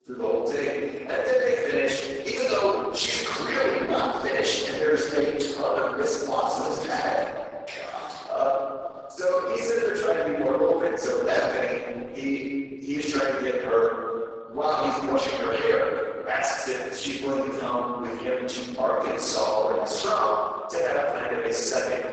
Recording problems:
room echo; strong; dies away in 1.9 s
off-mic speech; far
garbled, watery; badly; nothing above 8 kHz
thin; somewhat; fading below 500 Hz

